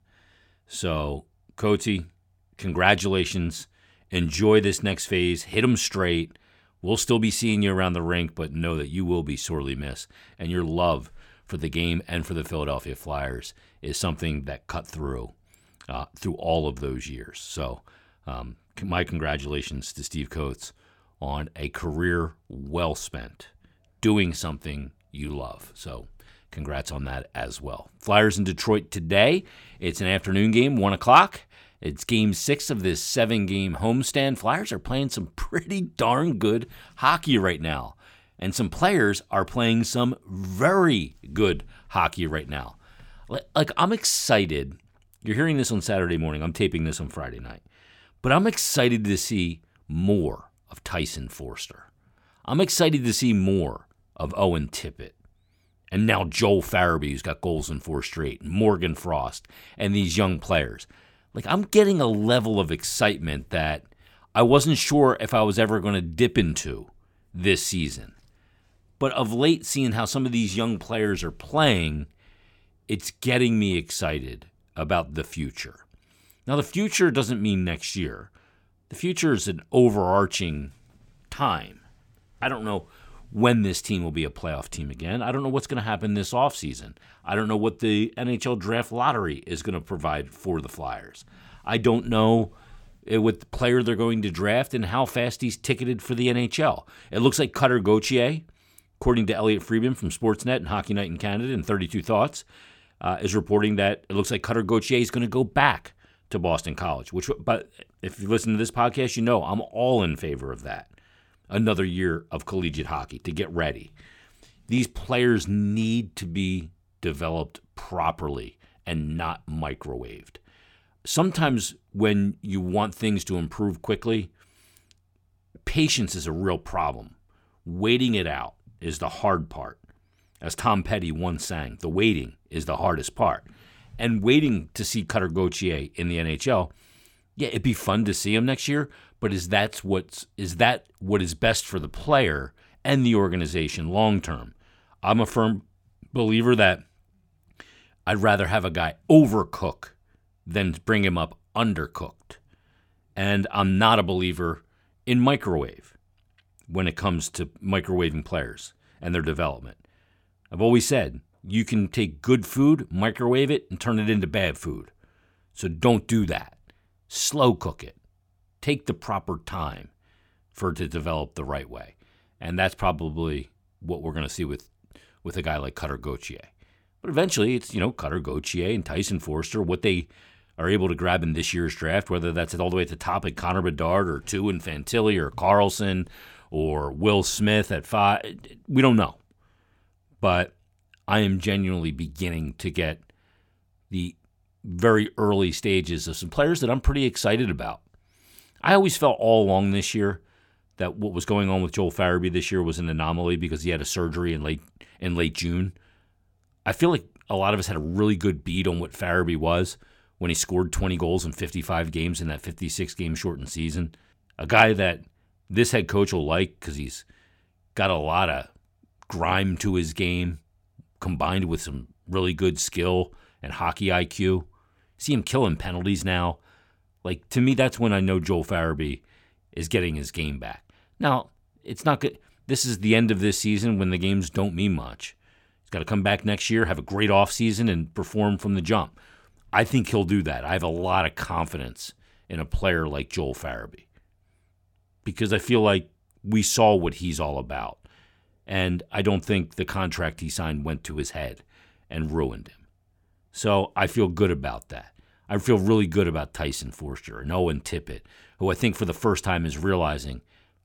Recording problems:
none

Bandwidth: 17 kHz